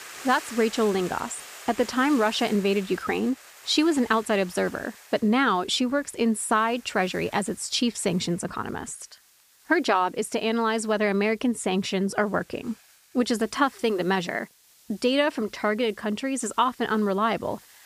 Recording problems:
hiss; faint; throughout; 20 dB below the speech

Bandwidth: 15 kHz